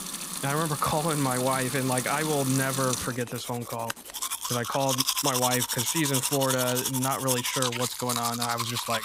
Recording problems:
household noises; loud; throughout; as loud as the speech

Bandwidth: 15.5 kHz